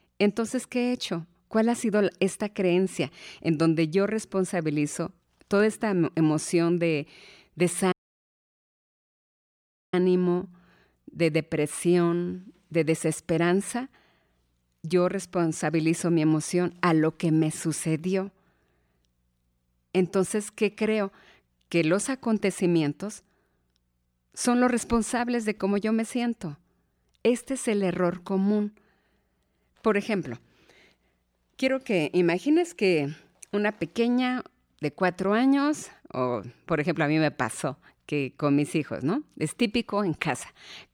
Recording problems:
audio cutting out; at 8 s for 2 s

